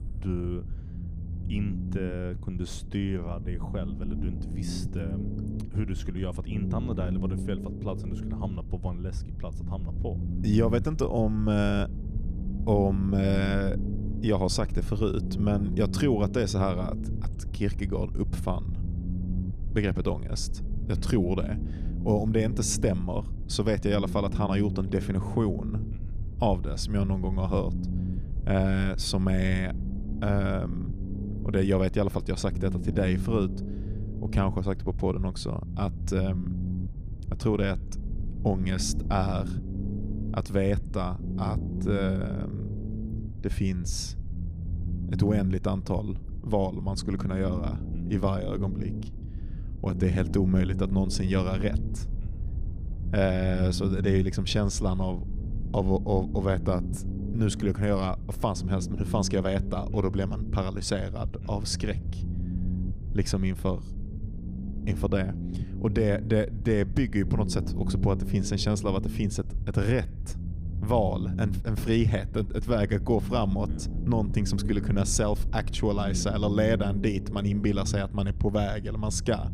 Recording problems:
low rumble; noticeable; throughout; 10 dB below the speech

